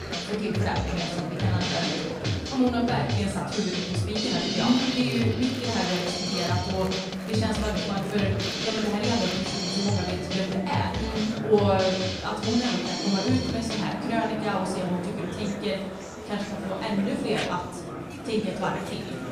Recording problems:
off-mic speech; far
room echo; noticeable; dies away in 0.7 s
background music; loud; throughout; 2 dB below the speech
murmuring crowd; loud; throughout; 8 dB below the speech

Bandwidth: 15.5 kHz